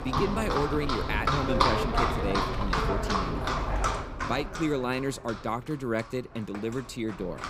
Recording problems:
animal sounds; very loud; throughout; 3 dB above the speech

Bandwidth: 15.5 kHz